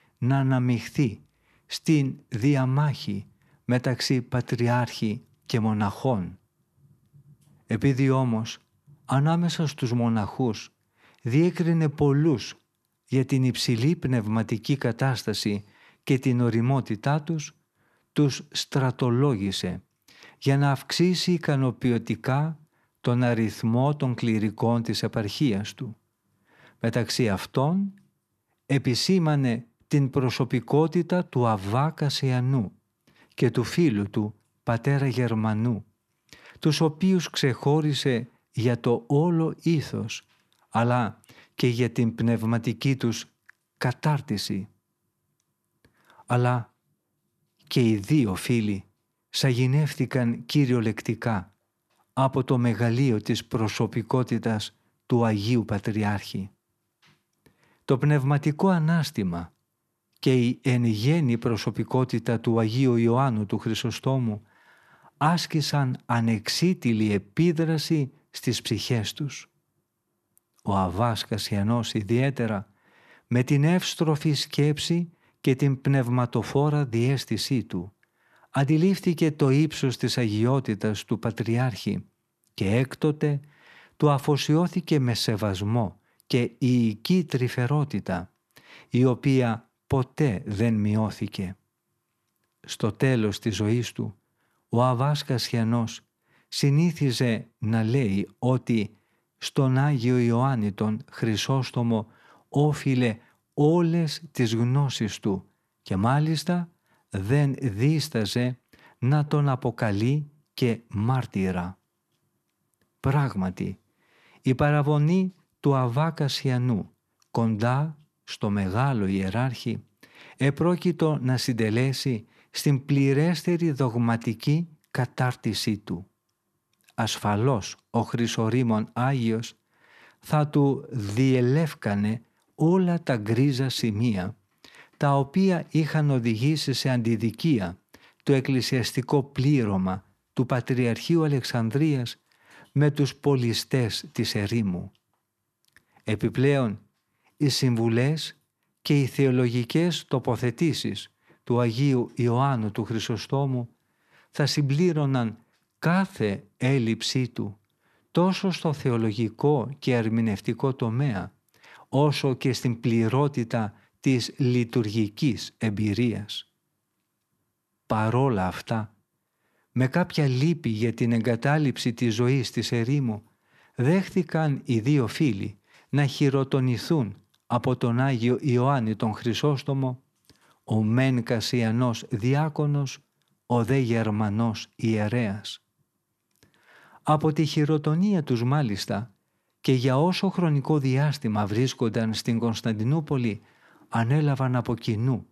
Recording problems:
none

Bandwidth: 13.5 kHz